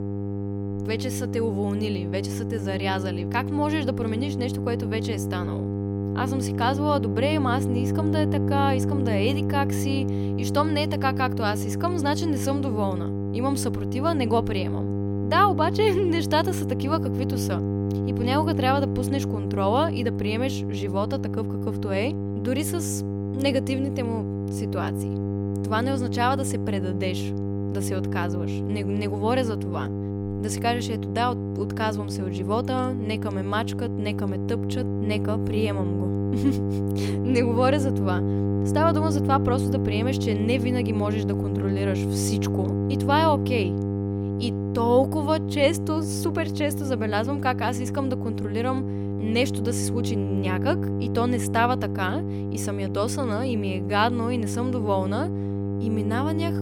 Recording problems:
electrical hum; loud; throughout; 50 Hz, 6 dB below the speech

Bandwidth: 17.5 kHz